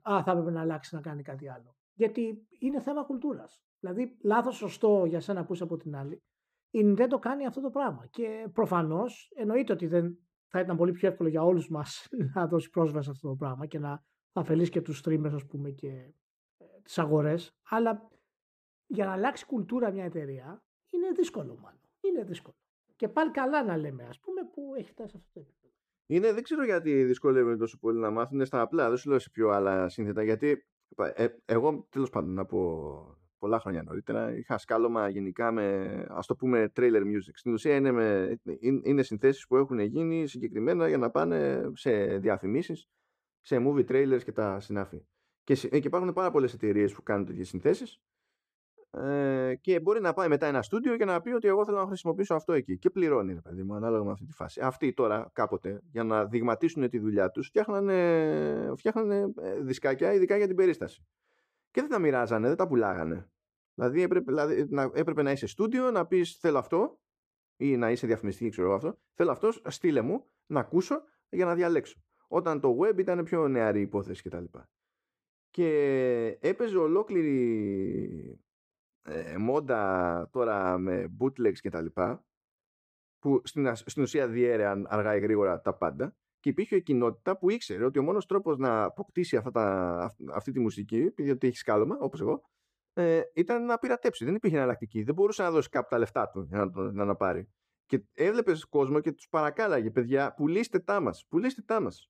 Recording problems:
muffled; slightly; fading above 2.5 kHz

